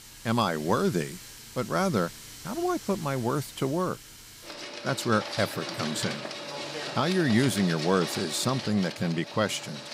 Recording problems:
household noises; loud; throughout; 9 dB below the speech

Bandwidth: 15.5 kHz